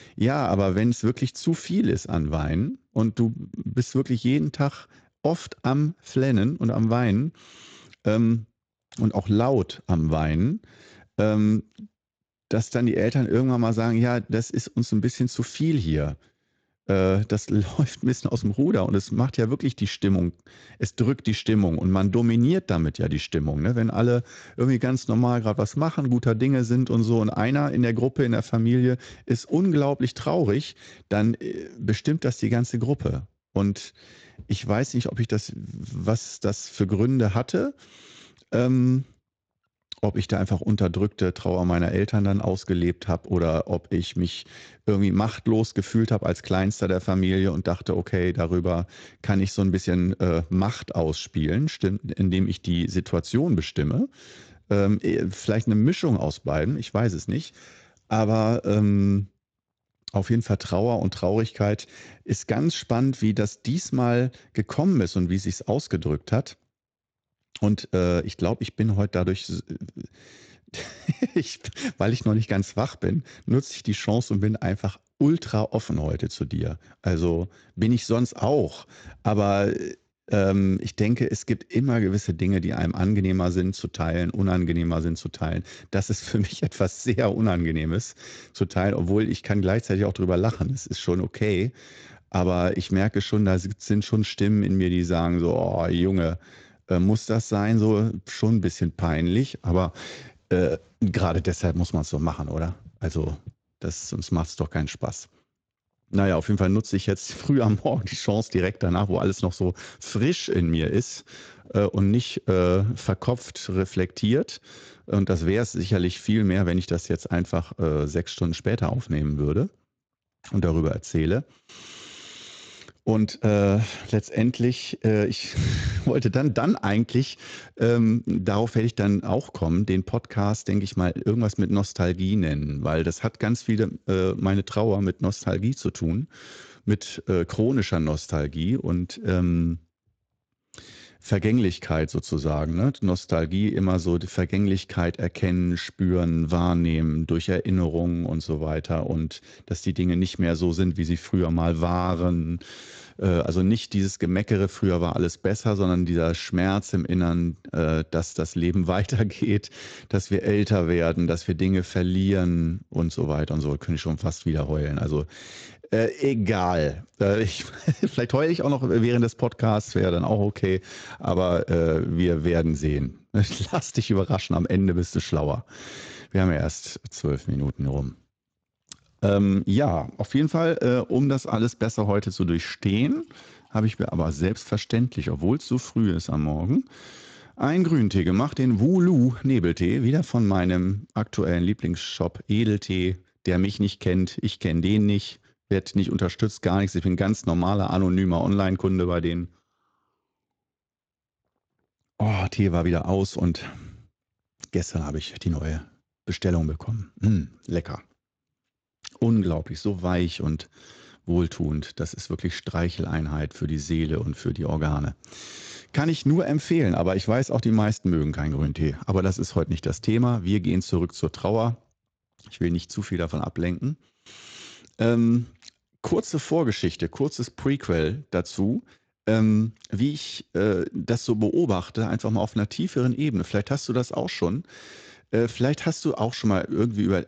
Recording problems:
garbled, watery; slightly; nothing above 7.5 kHz

